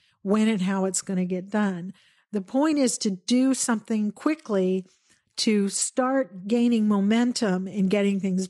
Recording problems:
garbled, watery; slightly; nothing above 10.5 kHz

